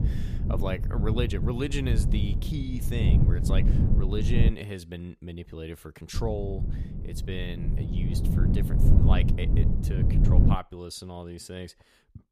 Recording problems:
low rumble; loud; until 4.5 s and from 6 to 11 s; 1 dB below the speech

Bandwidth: 15 kHz